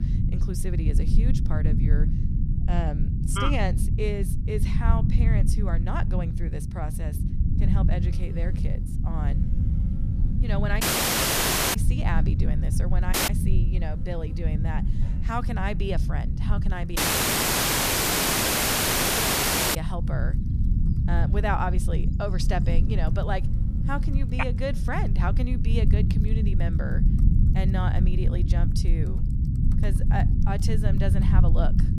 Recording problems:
low rumble; loud; throughout; 5 dB below the speech
electrical hum; faint; from 8 to 25 s; 50 Hz, 25 dB below the speech
household noises; faint; throughout; 30 dB below the speech
audio cutting out; at 11 s for 1 s, at 13 s and at 17 s for 3 s

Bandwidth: 14.5 kHz